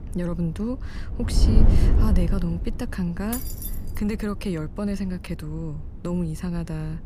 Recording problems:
wind noise on the microphone; heavy; 5 dB below the speech
jangling keys; noticeable; at 3.5 s; peak 3 dB below the speech

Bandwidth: 15 kHz